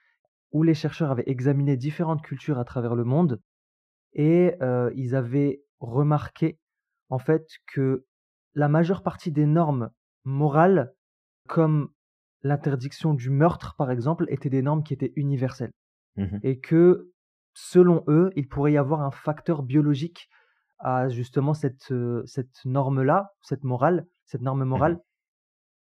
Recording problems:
muffled; very; fading above 3 kHz

